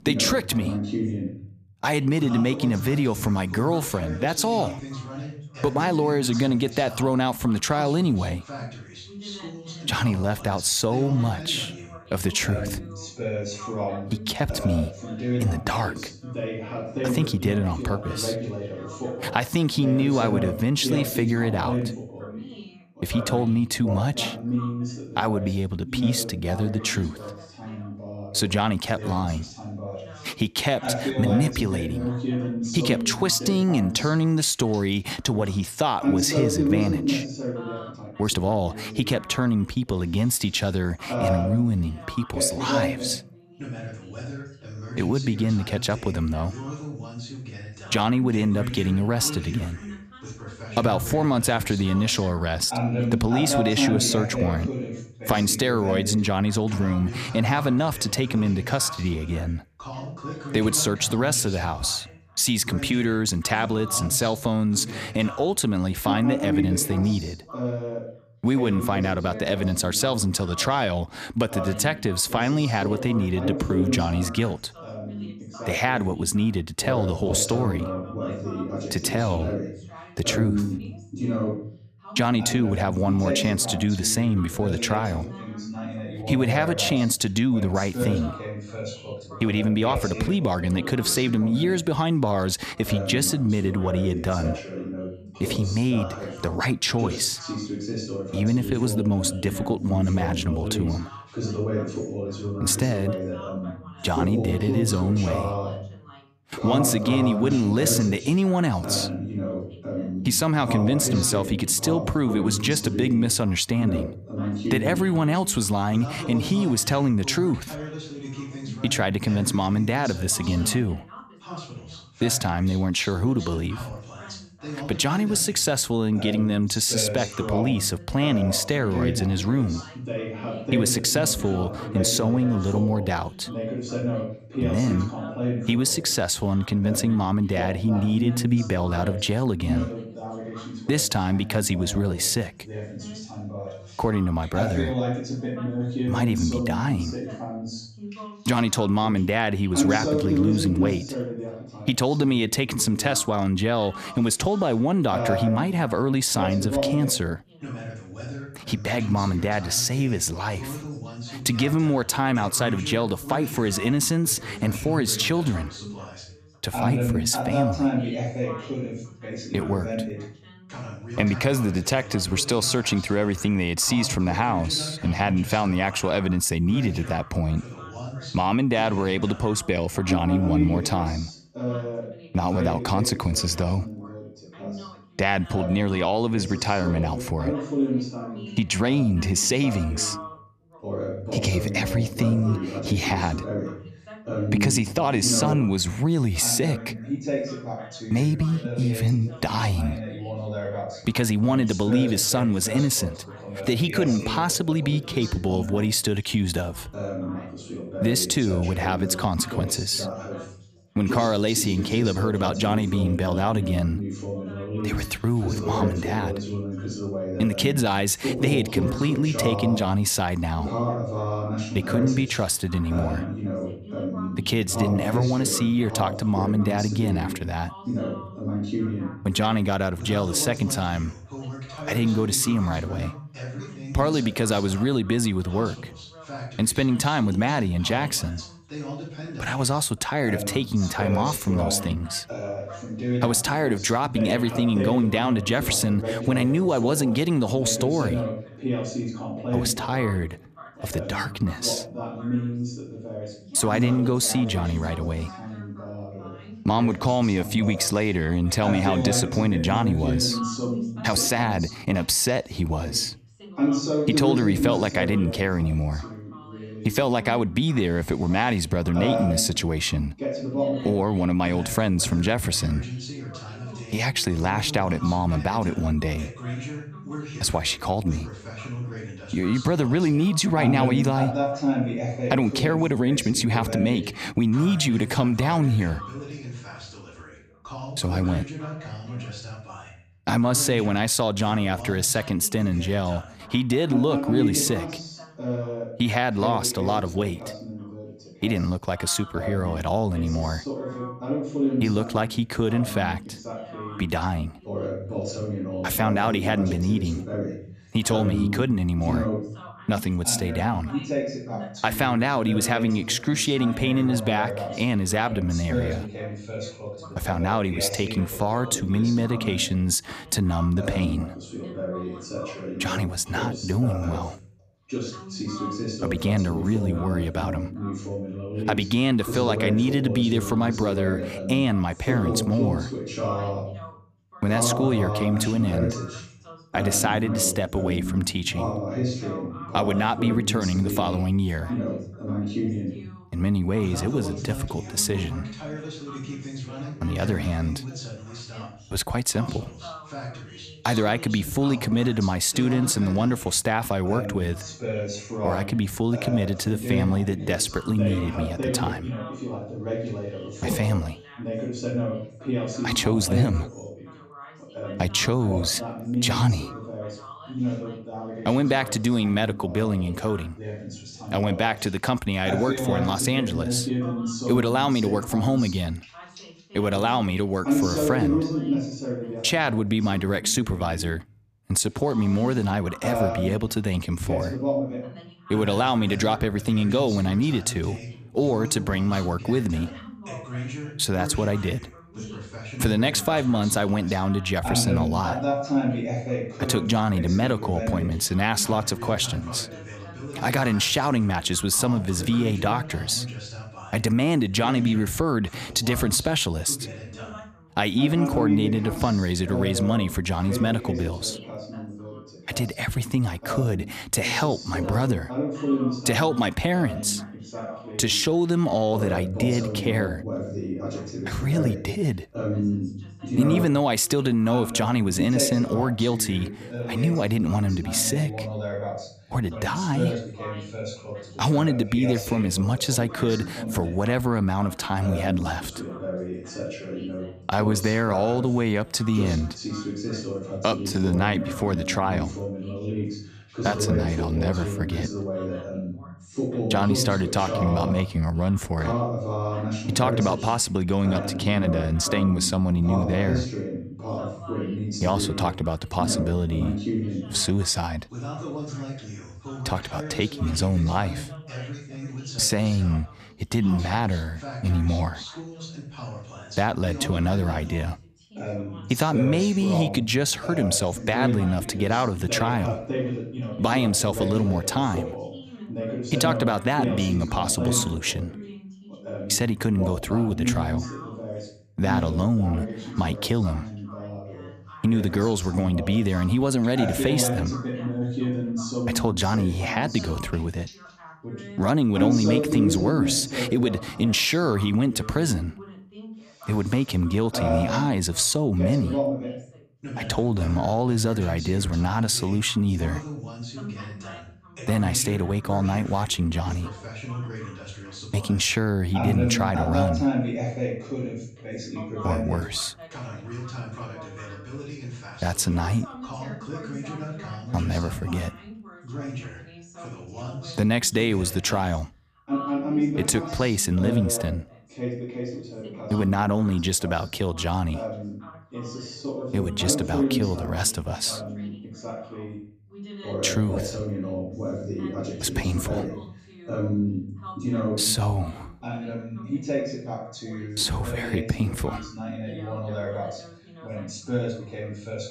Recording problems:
background chatter; loud; throughout; 2 voices, 7 dB below the speech
uneven, jittery; strongly; from 38 s to 7:21

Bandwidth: 14.5 kHz